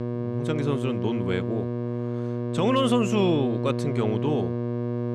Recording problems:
electrical hum; loud; throughout; 60 Hz, 5 dB below the speech

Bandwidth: 13.5 kHz